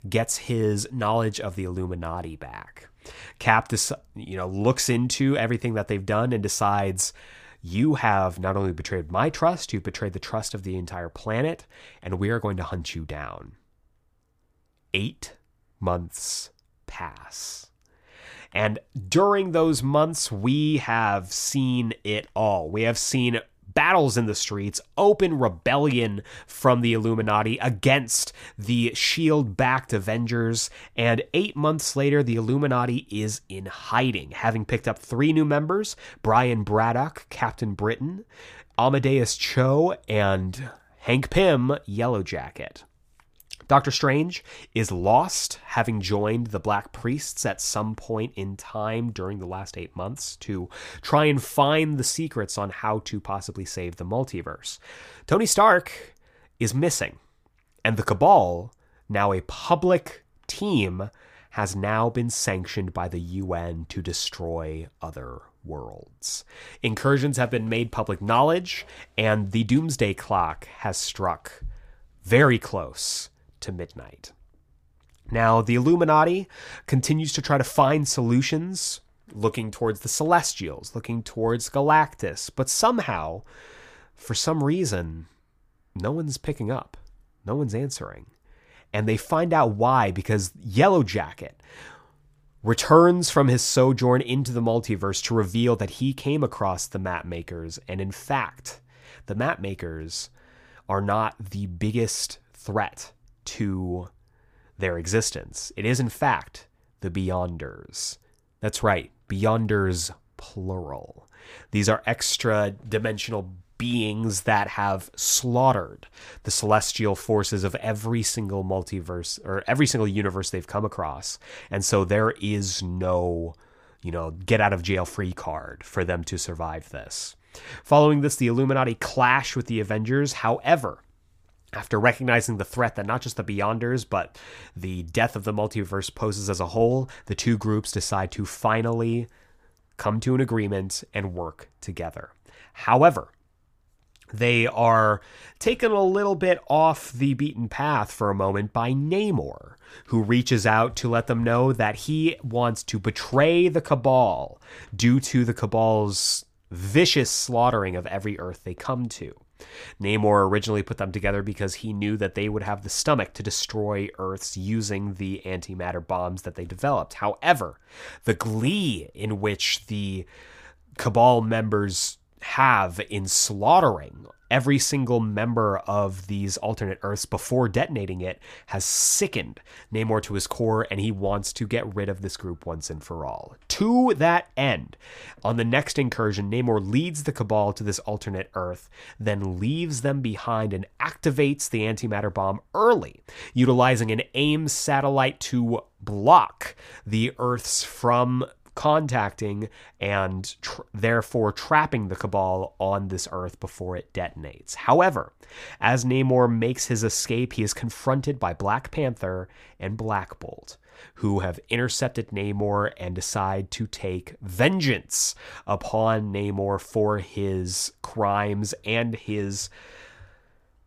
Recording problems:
none

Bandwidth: 15 kHz